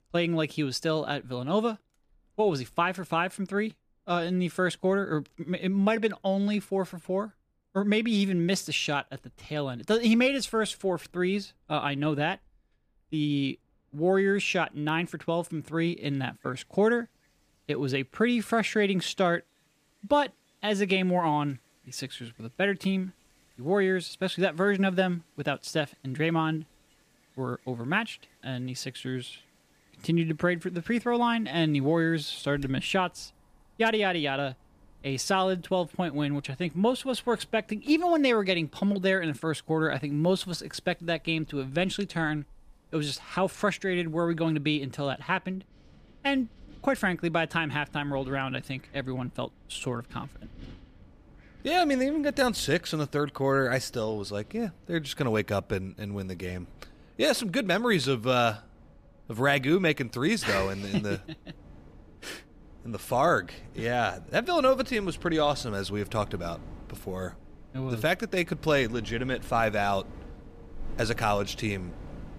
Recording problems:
wind in the background; faint; throughout; 25 dB below the speech

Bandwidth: 15 kHz